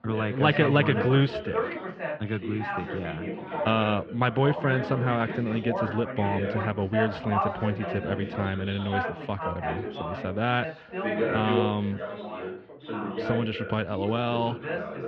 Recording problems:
muffled; very; fading above 3 kHz
background chatter; loud; throughout; 3 voices, 5 dB below the speech

